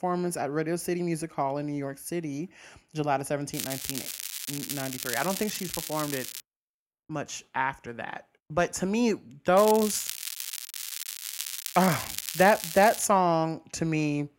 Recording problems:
crackling; loud; from 3.5 to 6.5 s, from 9.5 to 11 s and from 11 to 13 s; 6 dB below the speech

